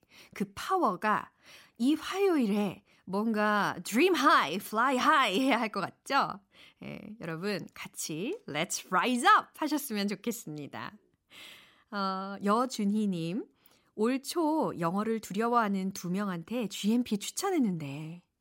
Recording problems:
none

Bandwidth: 16 kHz